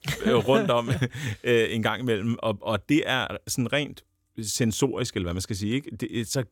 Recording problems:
none

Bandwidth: 17 kHz